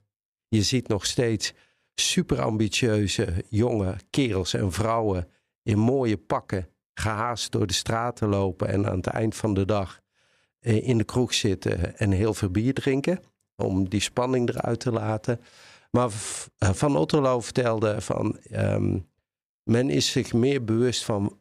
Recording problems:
none

